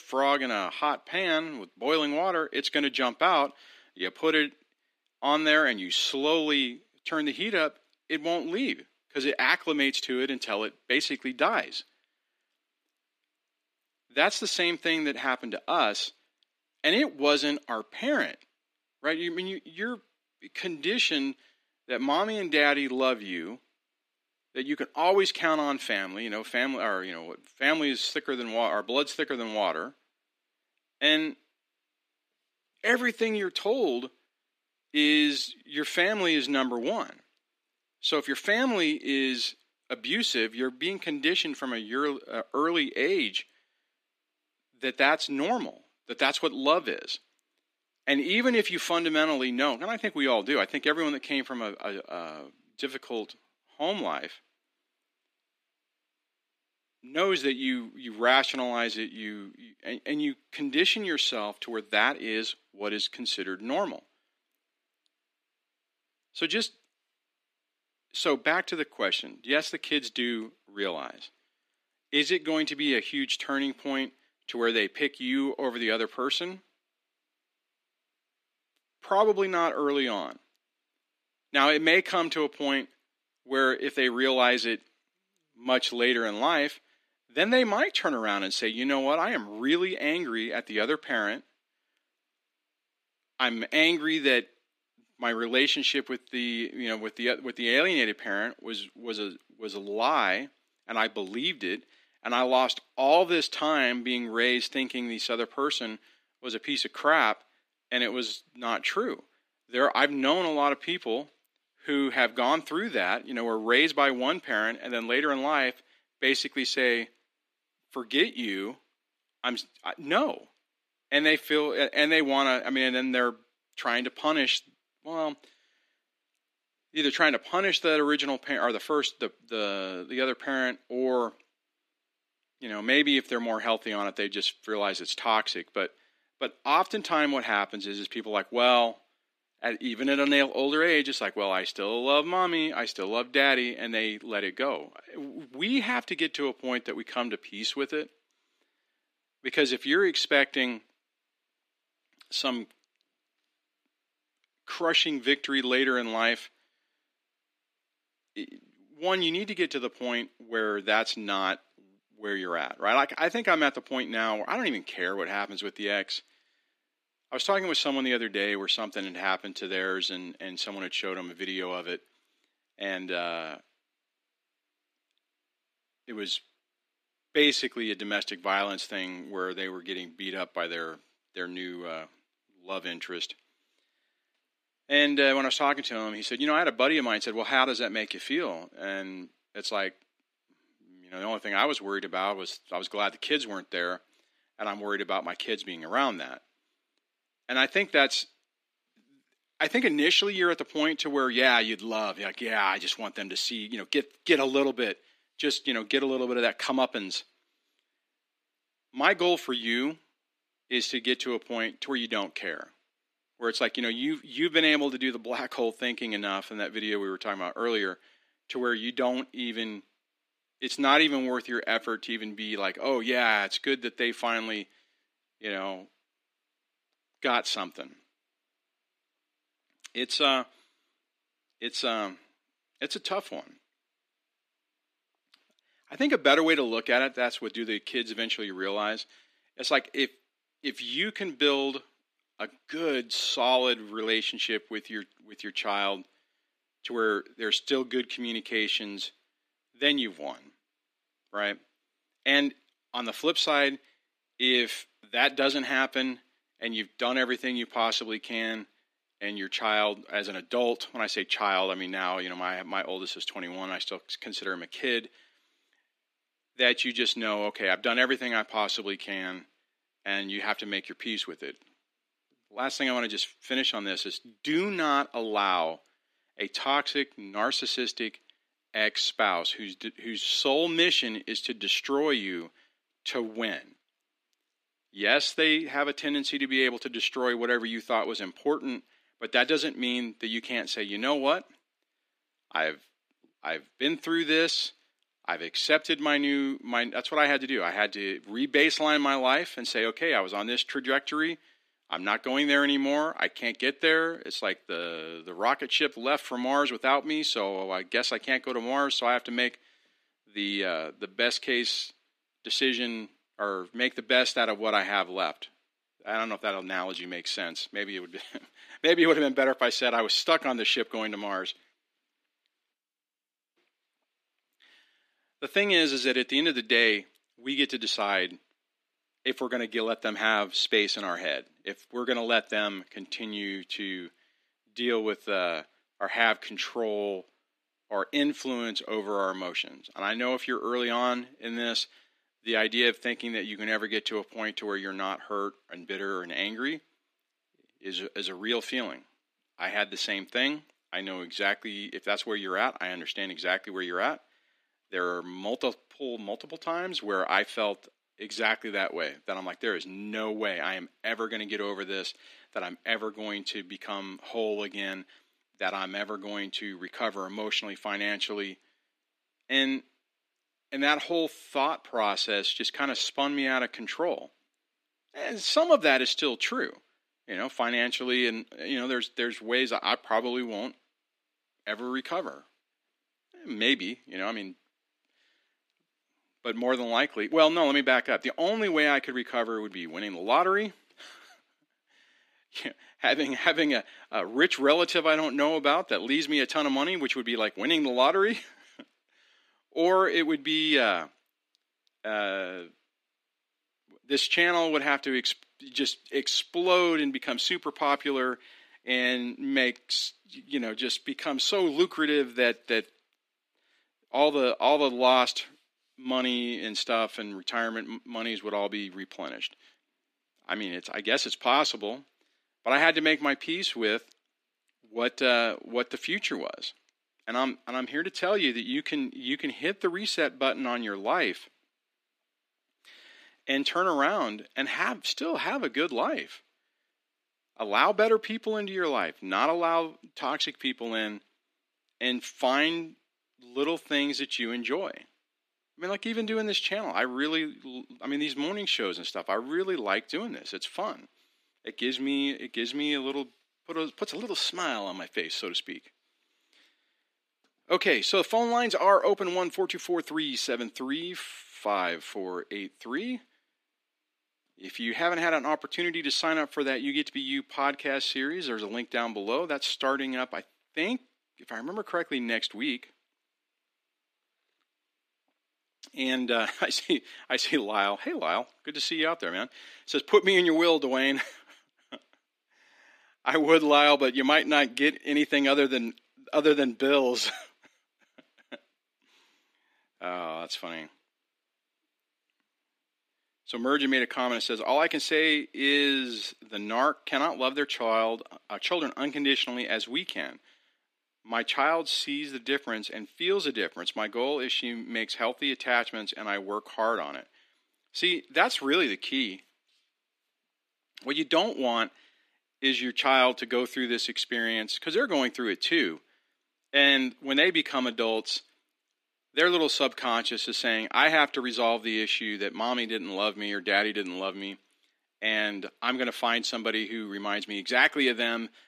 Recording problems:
thin; very slightly; fading below 250 Hz

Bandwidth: 14.5 kHz